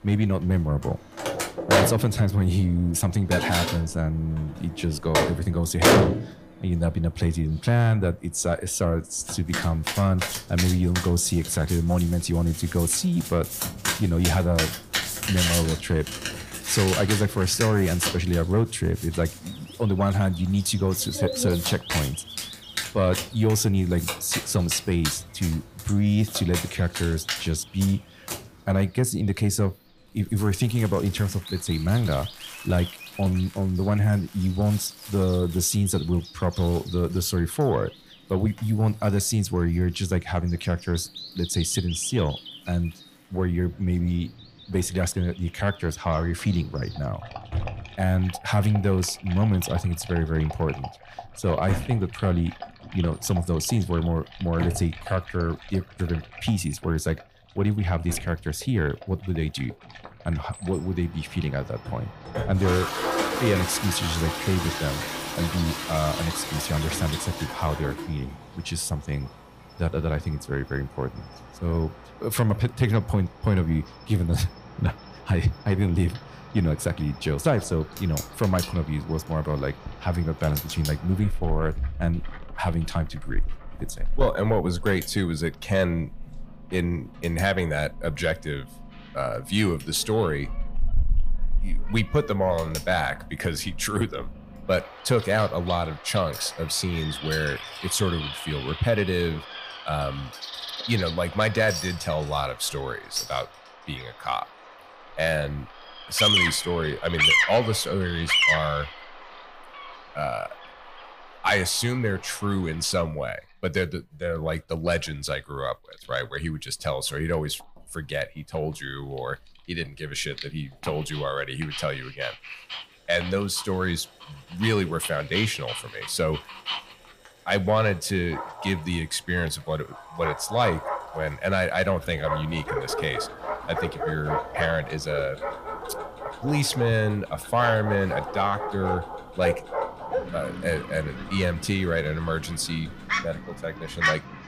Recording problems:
distortion; heavy; 6 dB below the speech
animal sounds; loud; throughout; 7 dB below the speech
household noises; loud; throughout; 4 dB below the speech

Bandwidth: 15 kHz